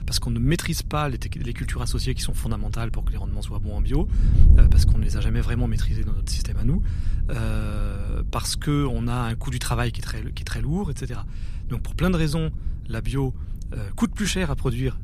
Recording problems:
wind noise on the microphone; occasional gusts; 15 dB below the speech

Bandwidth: 14.5 kHz